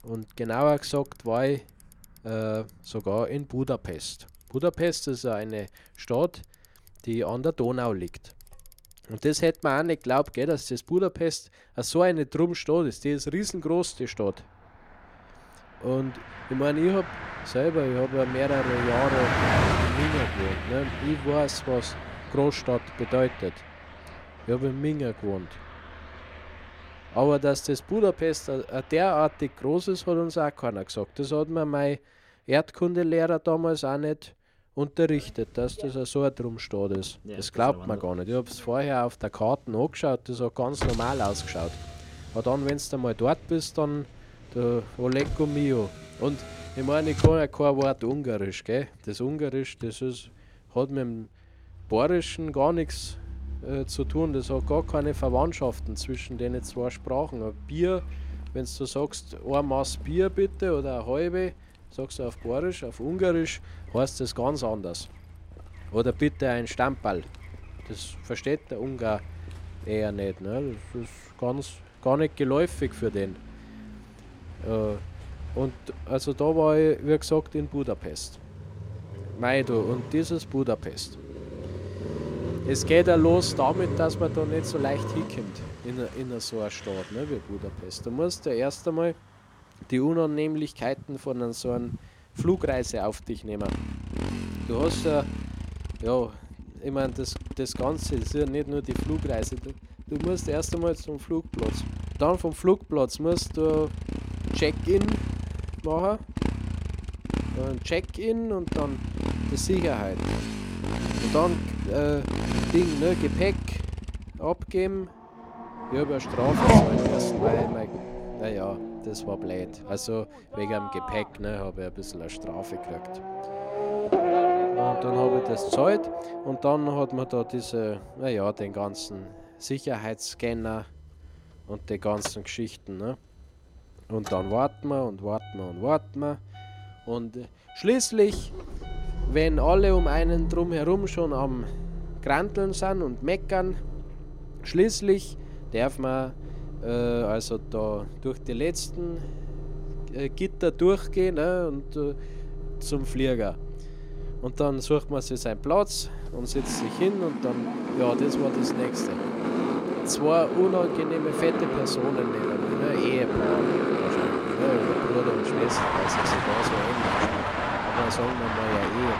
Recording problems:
traffic noise; loud; throughout; 3 dB below the speech

